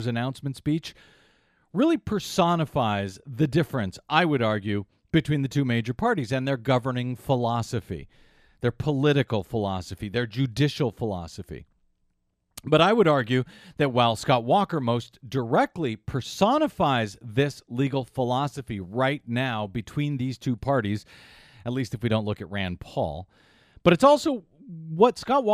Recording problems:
abrupt cut into speech; at the start and the end

